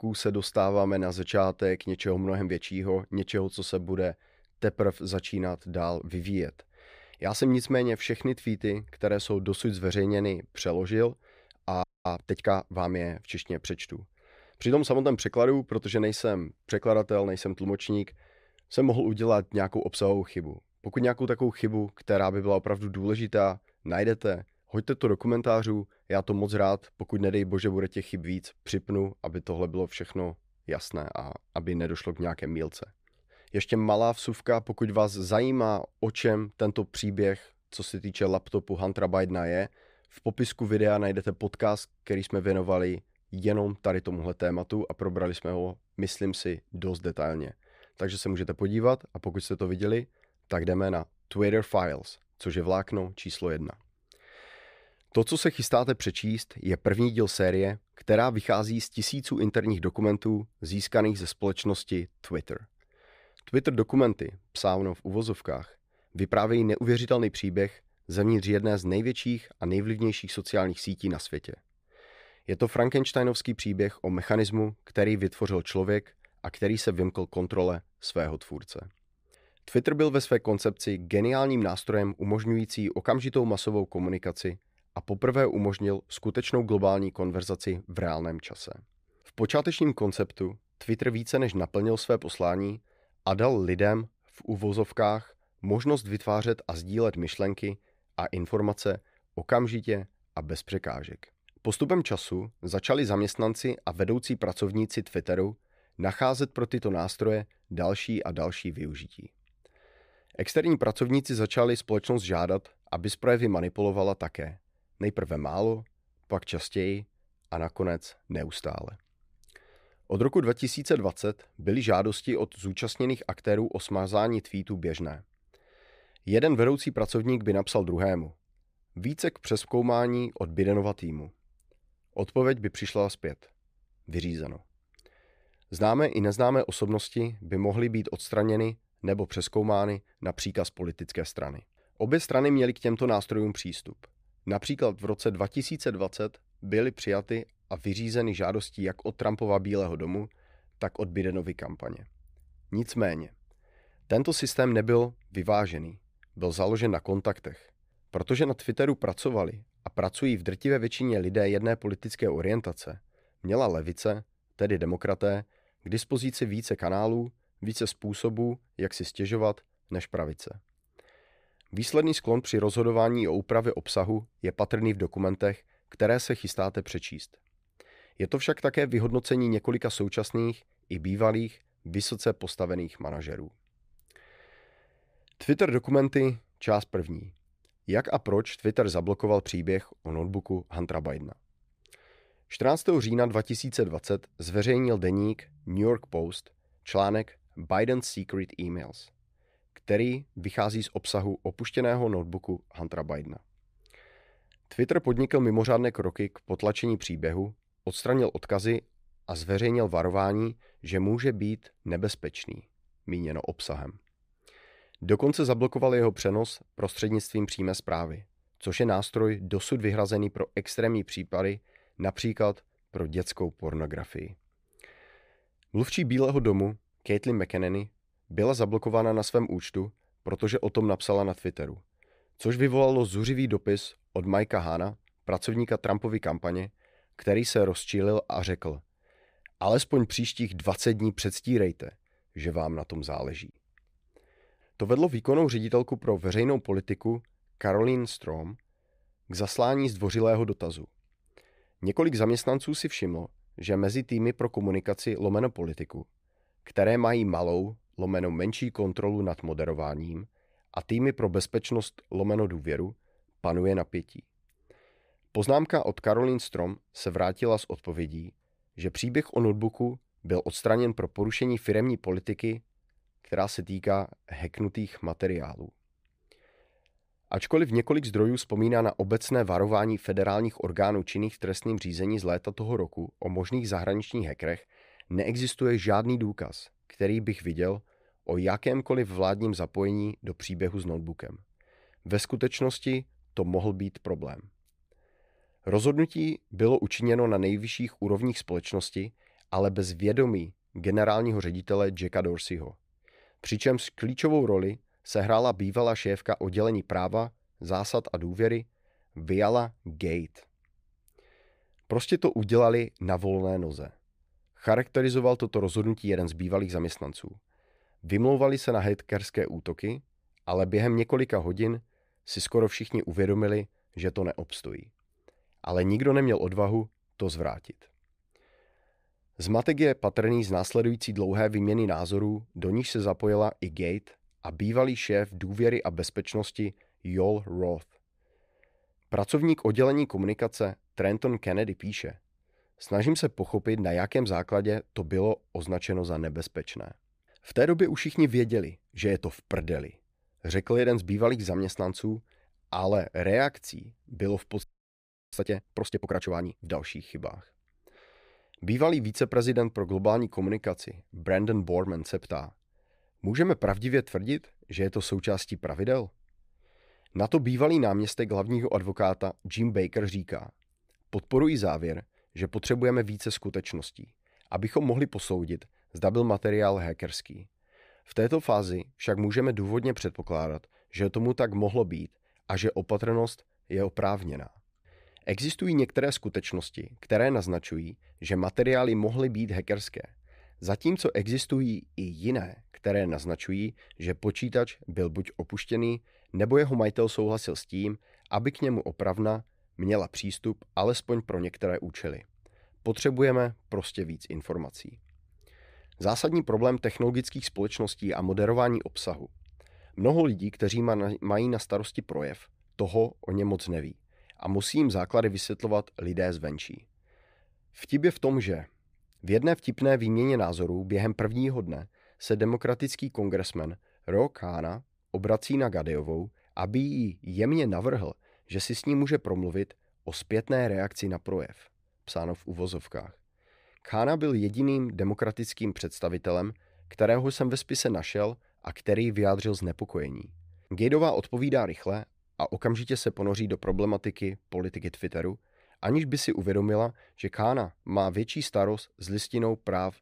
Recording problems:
audio freezing; at 12 s and at 5:55 for 0.5 s

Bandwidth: 15 kHz